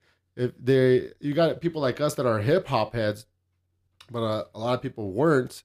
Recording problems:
none

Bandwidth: 15 kHz